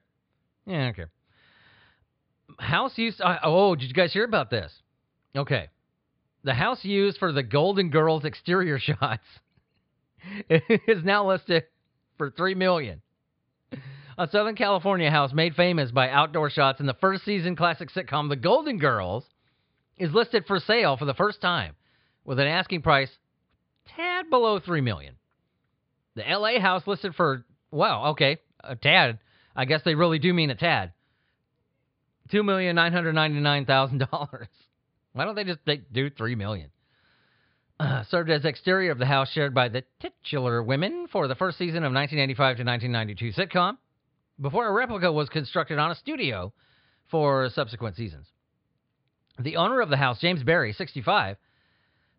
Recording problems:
high frequencies cut off; severe; nothing above 5 kHz

